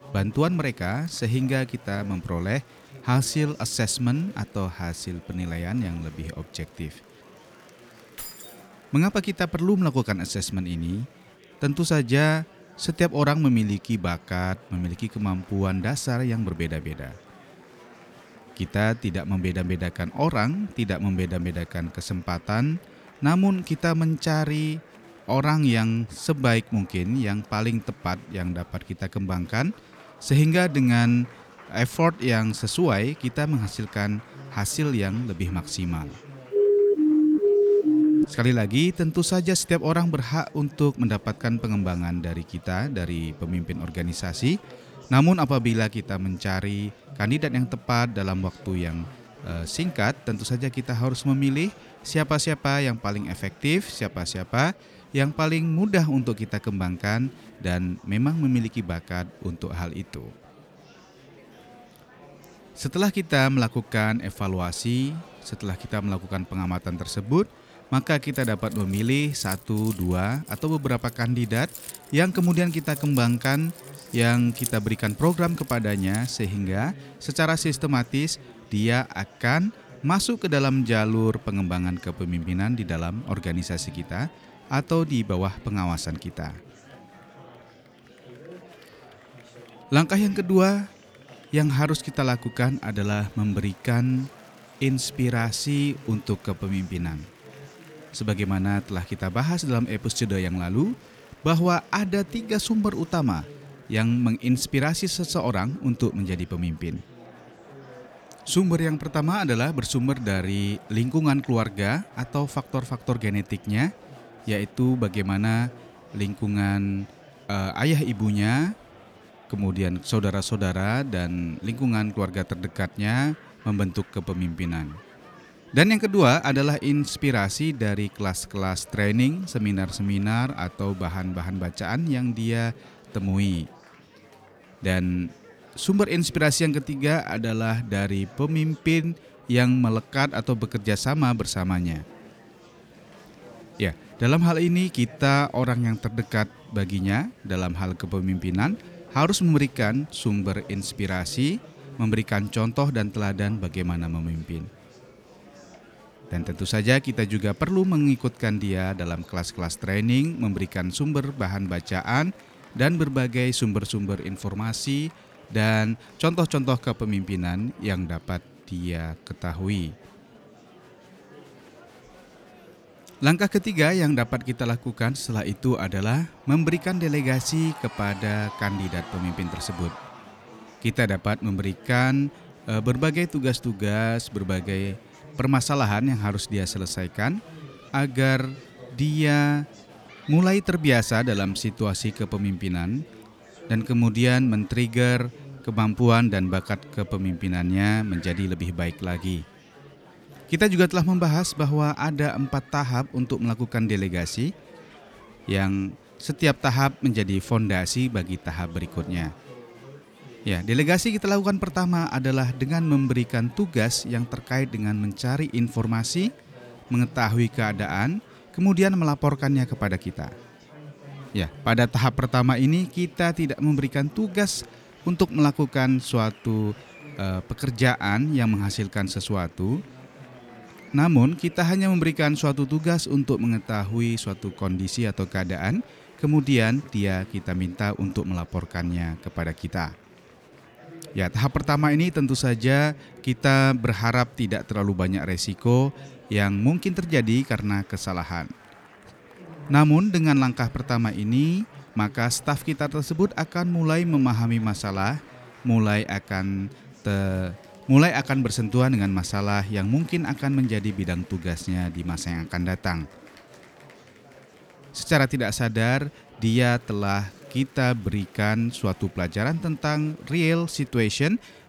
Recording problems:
murmuring crowd; faint; throughout; 20 dB below the speech
jangling keys; faint; at 8 s; peak 10 dB below the speech
siren; loud; from 37 to 38 s; peak 5 dB above the speech
jangling keys; noticeable; from 1:08 to 1:16; peak 7 dB below the speech

